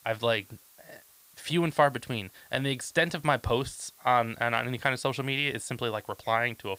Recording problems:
hiss; faint; throughout; 25 dB below the speech

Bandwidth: 15.5 kHz